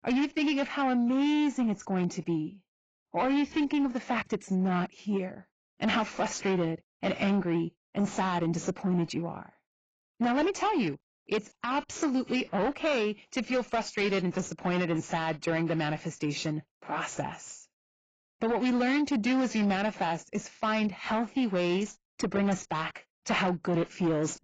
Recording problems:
garbled, watery; badly; nothing above 7.5 kHz
distortion; slight; 10 dB below the speech

